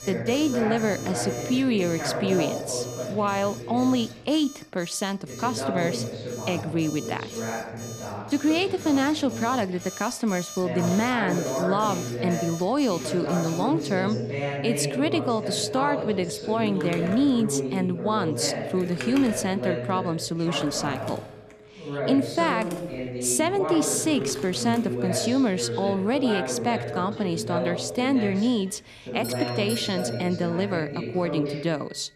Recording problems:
voice in the background; loud; throughout; 6 dB below the speech
alarms or sirens; noticeable; throughout; 15 dB below the speech
household noises; noticeable; throughout; 20 dB below the speech

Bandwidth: 14 kHz